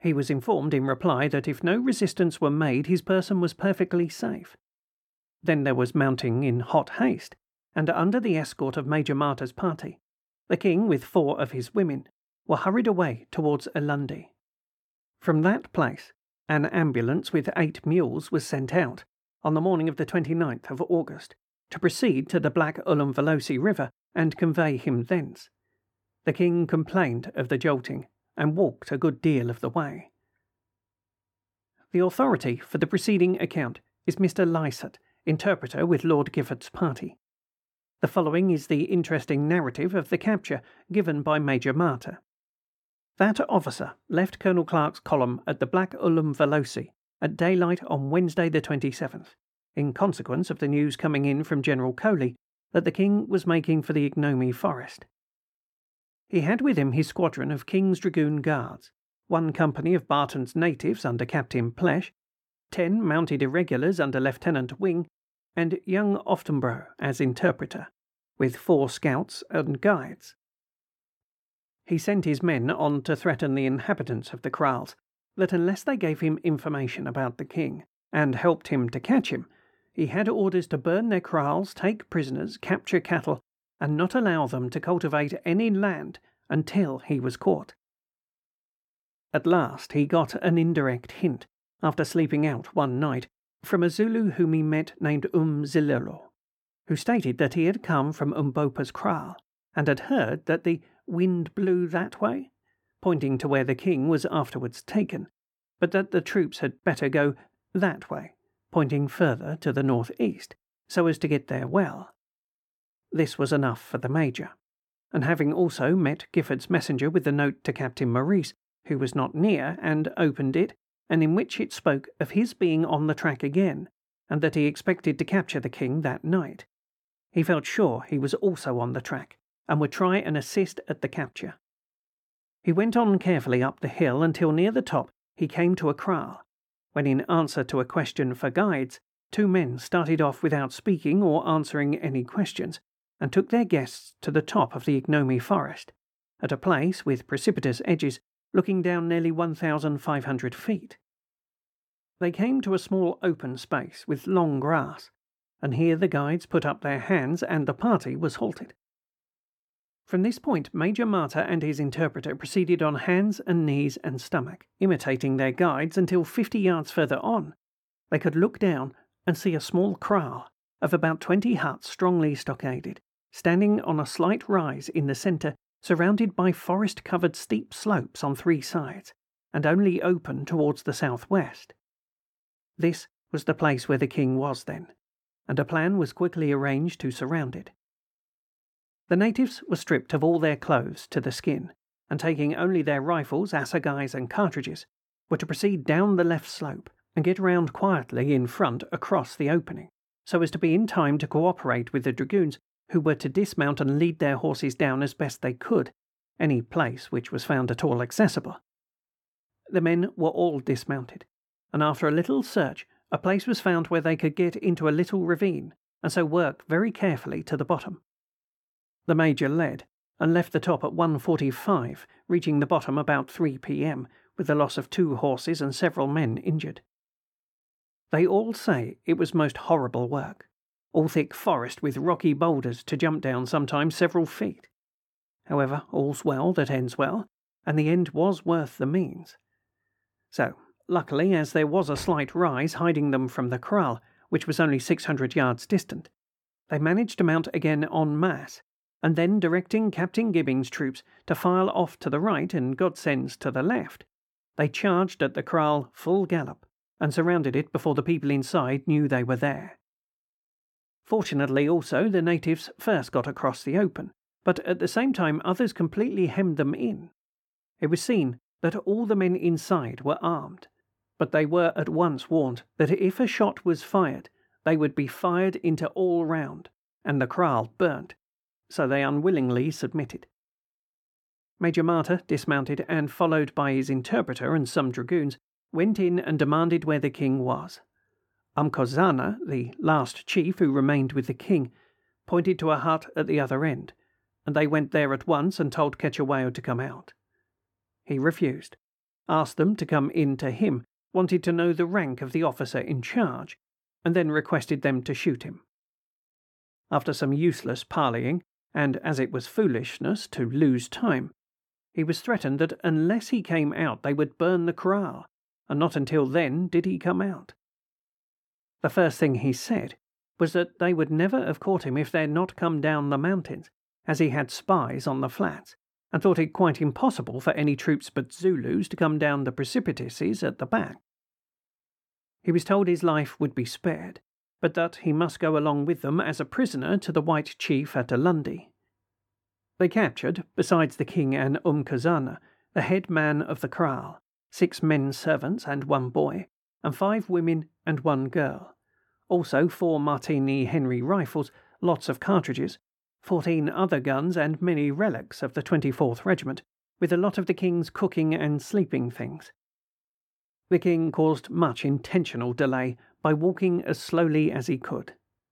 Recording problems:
muffled; slightly; fading above 2.5 kHz

